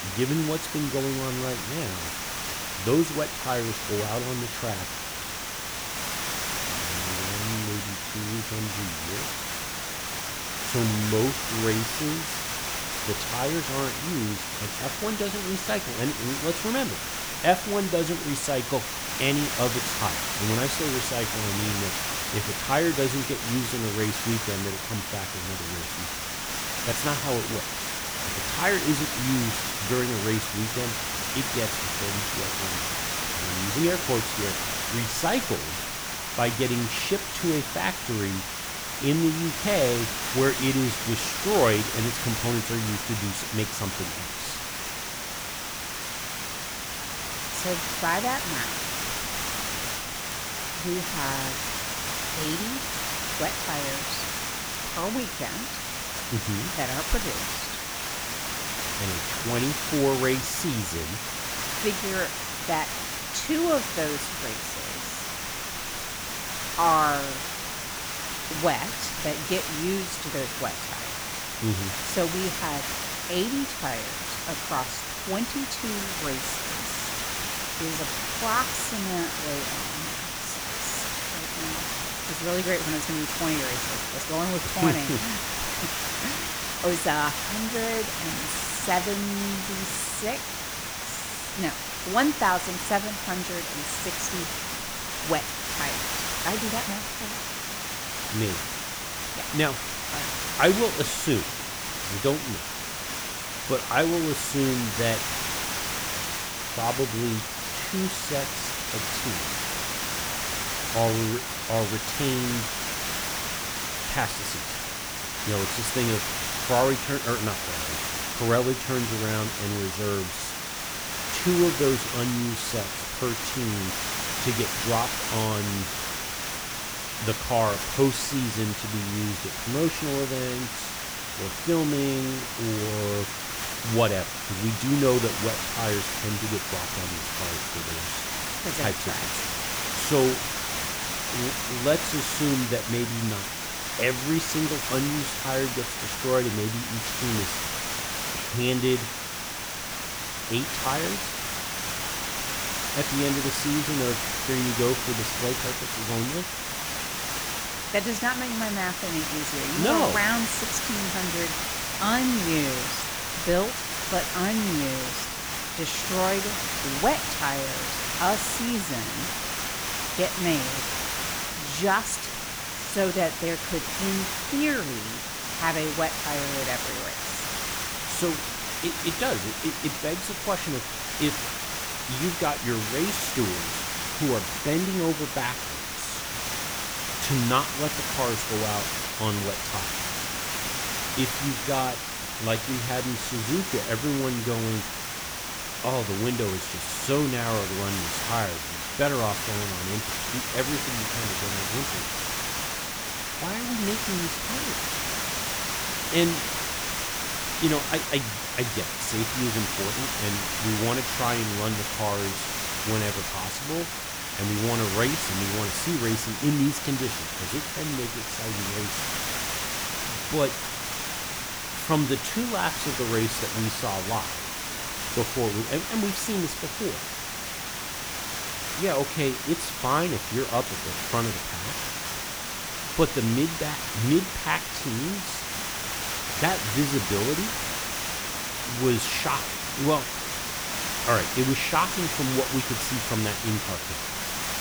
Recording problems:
hiss; loud; throughout; as loud as the speech
crackle, like an old record; very faint; 25 dB below the speech

